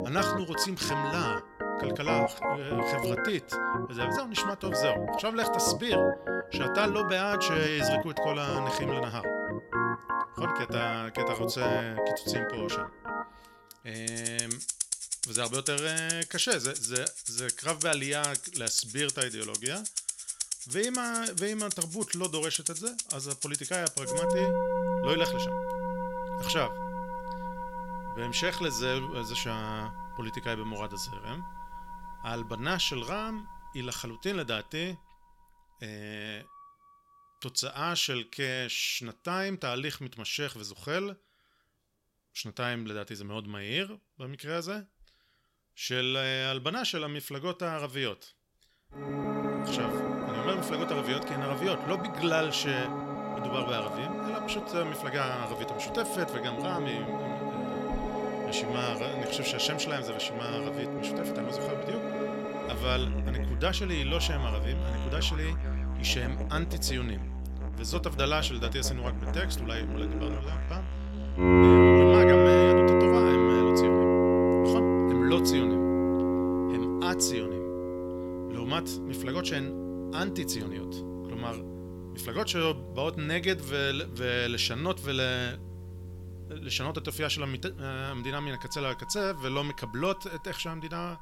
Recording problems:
background music; very loud; throughout; 4 dB above the speech

